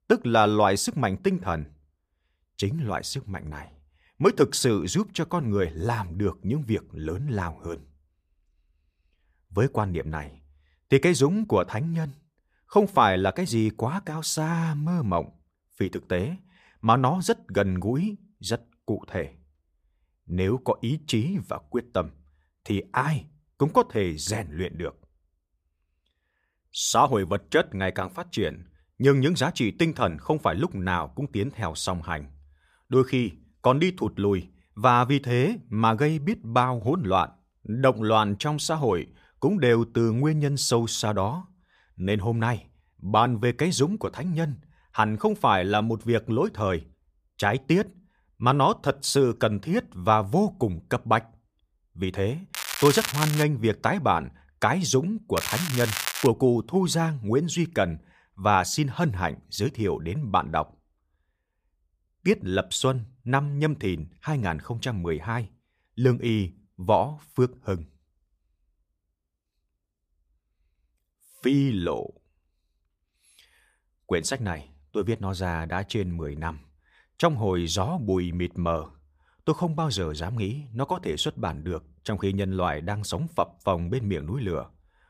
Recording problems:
crackling; loud; at 53 s and at 55 s; 4 dB below the speech

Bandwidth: 15 kHz